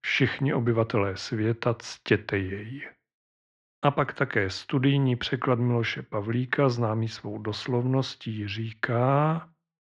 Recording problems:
muffled; slightly; fading above 4 kHz

